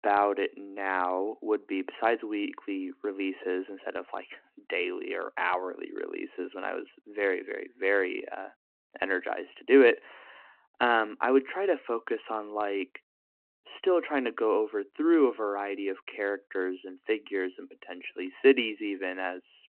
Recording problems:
phone-call audio

